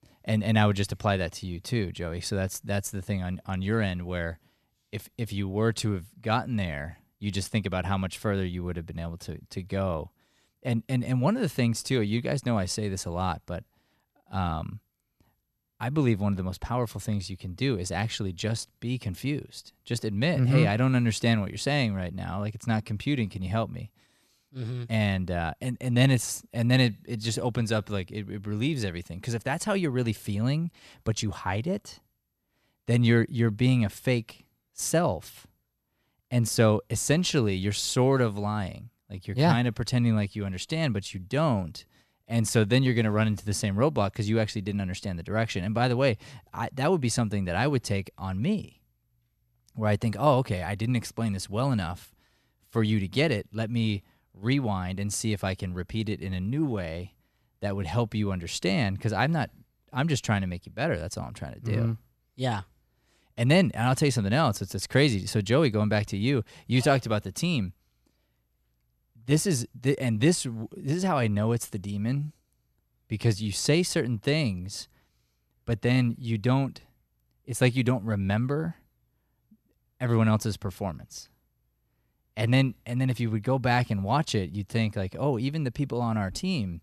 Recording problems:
none

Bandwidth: 13.5 kHz